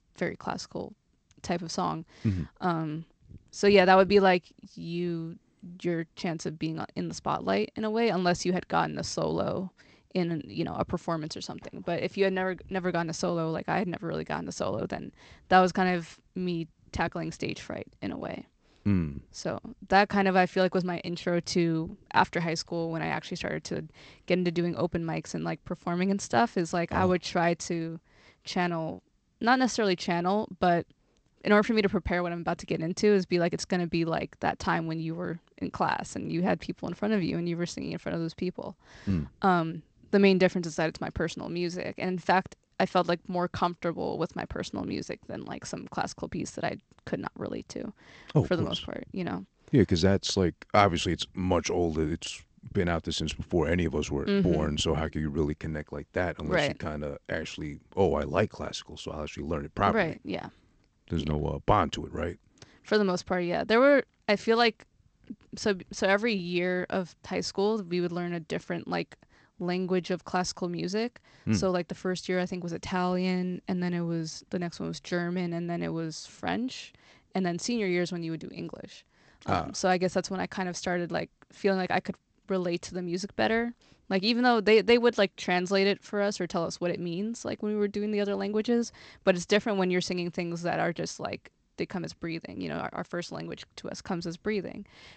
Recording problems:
garbled, watery; slightly; nothing above 8 kHz

